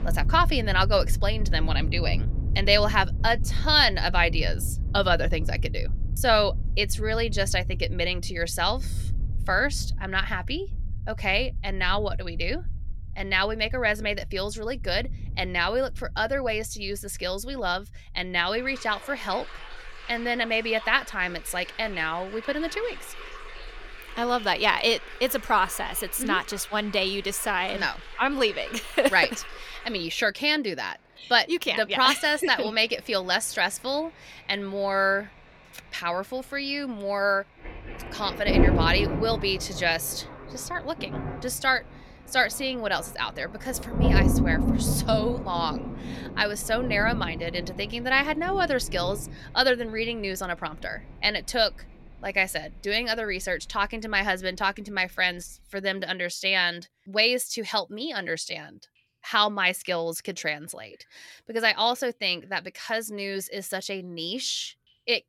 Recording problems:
rain or running water; loud; throughout; 7 dB below the speech

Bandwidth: 17 kHz